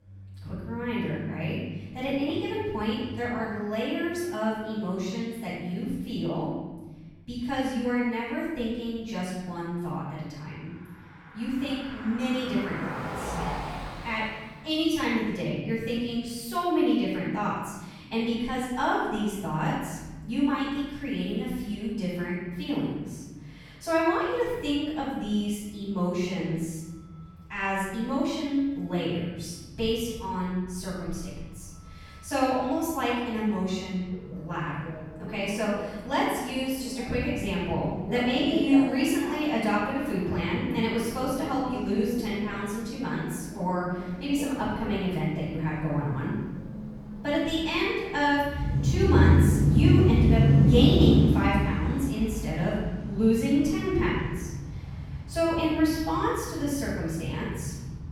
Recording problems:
room echo; strong; dies away in 1.6 s
off-mic speech; far
traffic noise; loud; throughout; as loud as the speech

